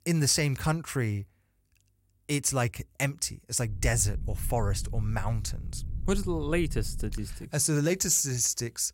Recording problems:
low rumble; faint; from 3.5 to 7.5 s; 25 dB below the speech

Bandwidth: 16 kHz